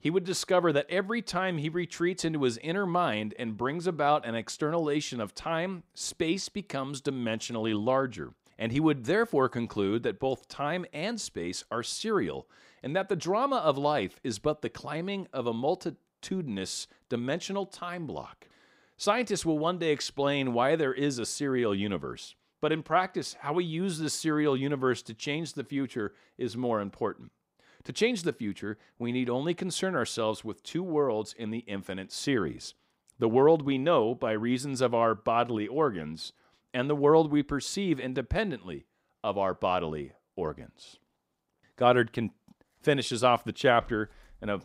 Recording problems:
none

